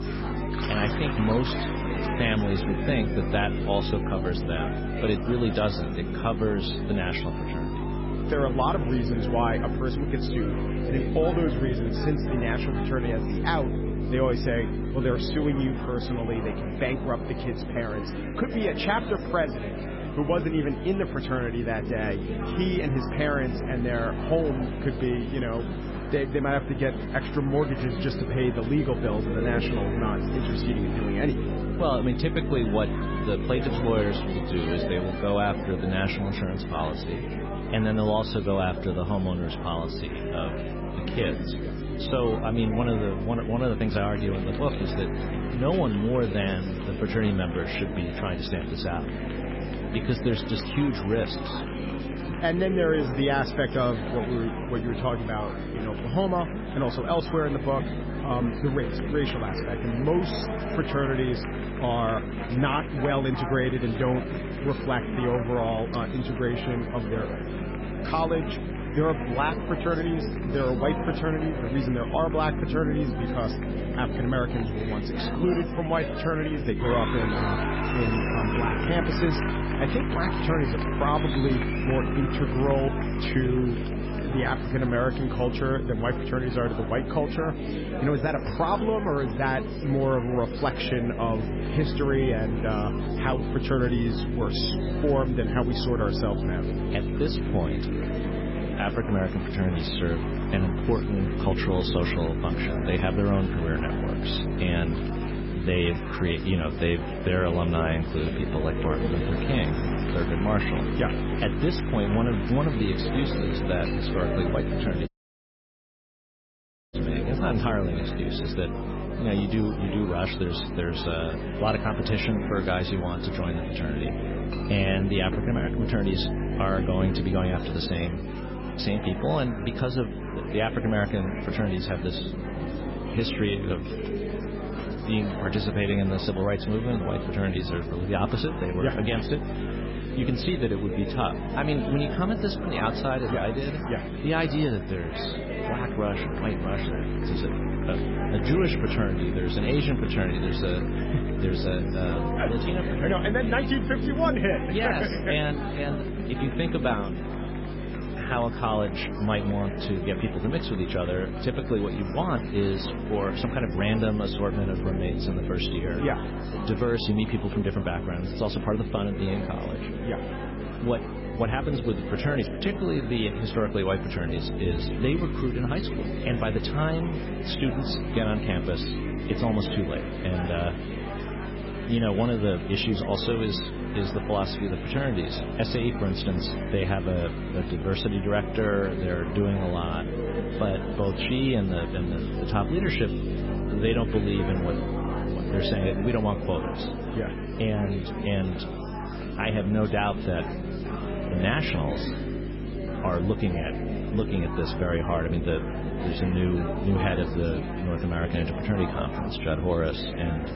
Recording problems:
garbled, watery; badly; nothing above 5.5 kHz
electrical hum; loud; throughout; 50 Hz, 9 dB below the speech
chatter from many people; loud; throughout; 7 dB below the speech
household noises; faint; throughout; 25 dB below the speech
audio cutting out; at 1:55 for 2 s

